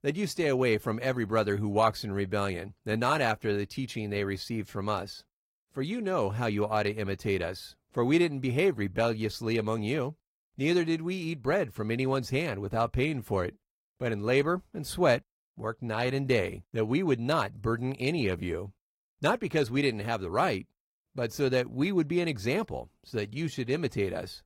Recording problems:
garbled, watery; slightly; nothing above 15.5 kHz

